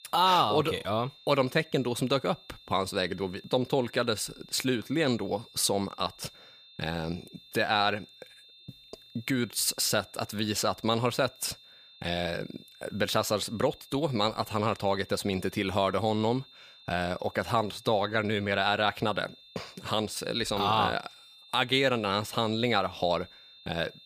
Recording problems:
high-pitched whine; faint; throughout; 3.5 kHz, 25 dB below the speech

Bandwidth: 15 kHz